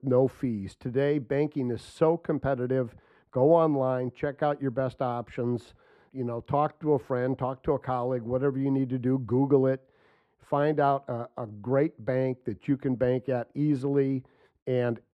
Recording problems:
muffled; very; fading above 2 kHz

